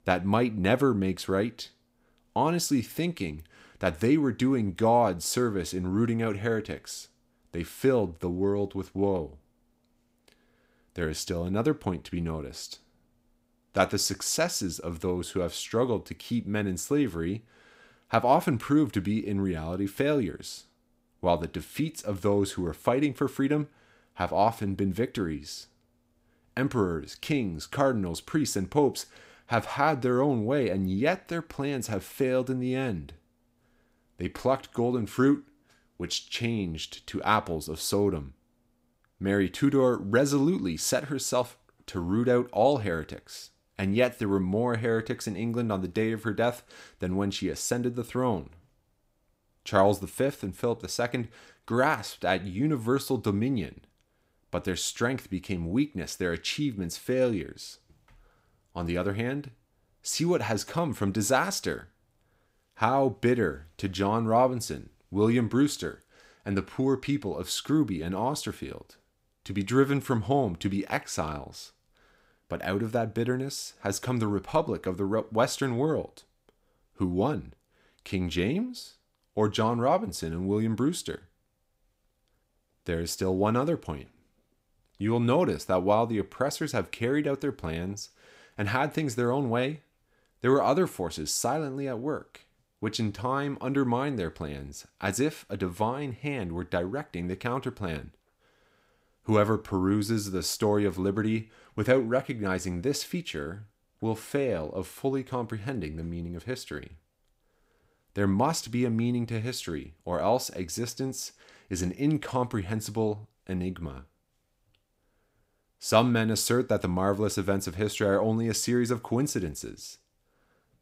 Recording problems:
none

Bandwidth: 15.5 kHz